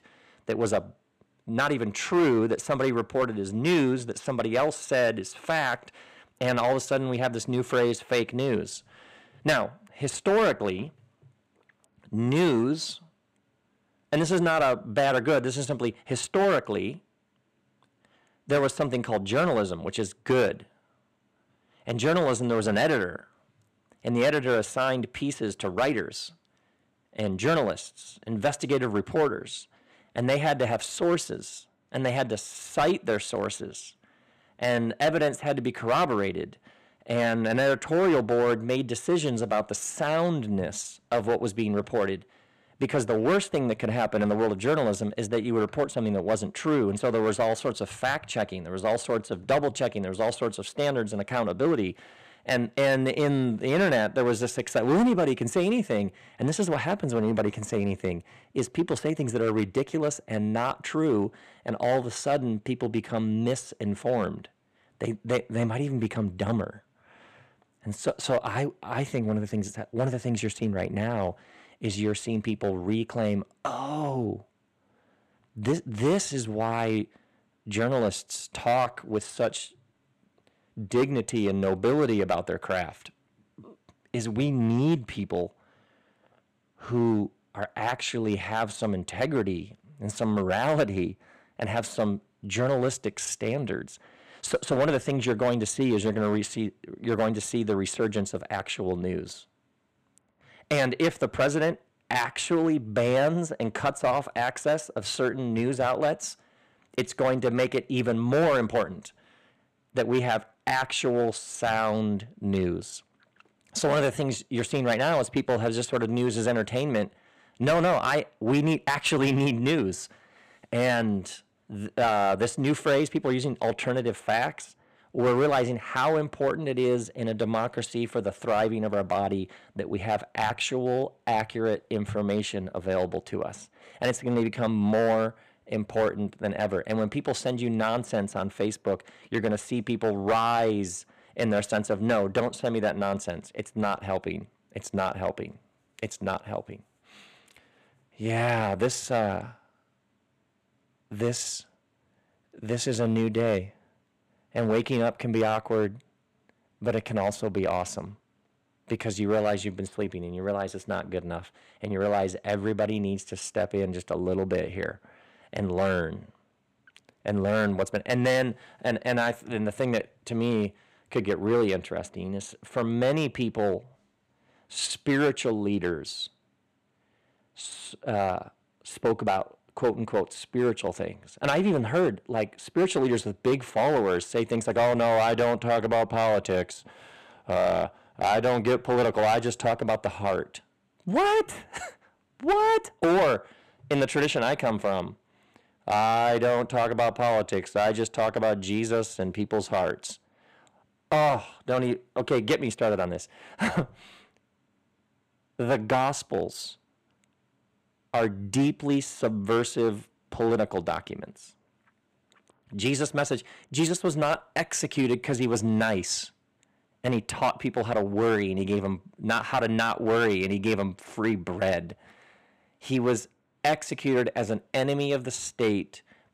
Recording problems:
distortion; slight; 4% of the sound clipped

